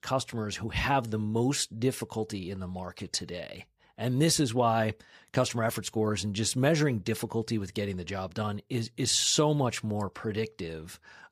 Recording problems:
none

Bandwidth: 15 kHz